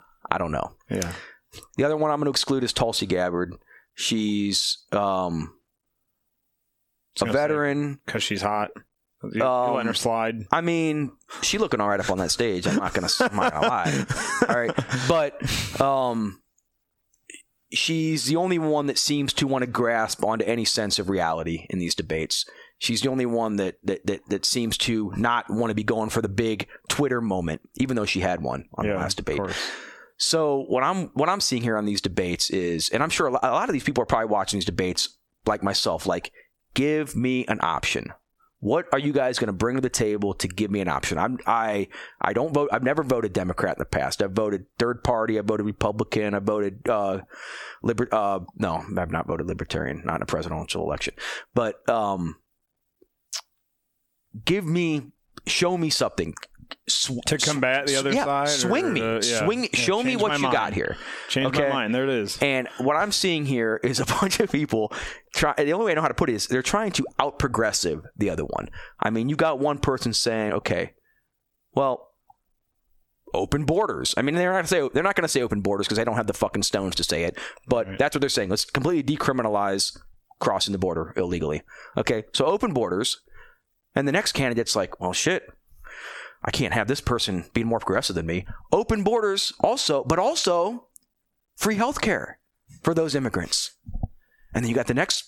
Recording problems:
squashed, flat; heavily

